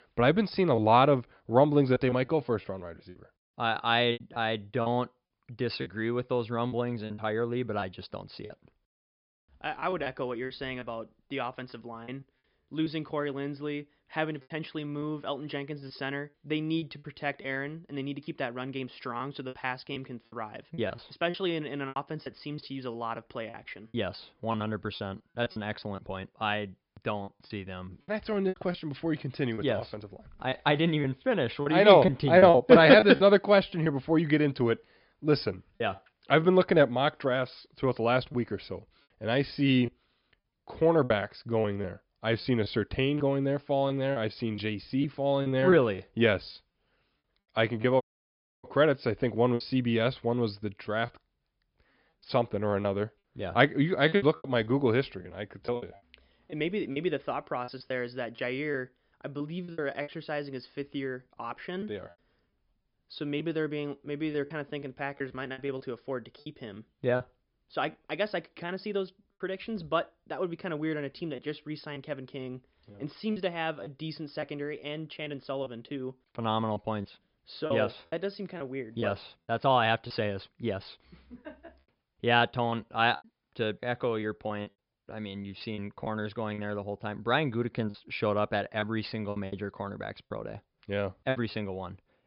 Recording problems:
high frequencies cut off; noticeable; nothing above 5.5 kHz
choppy; very; 7% of the speech affected
audio cutting out; at 48 s for 0.5 s

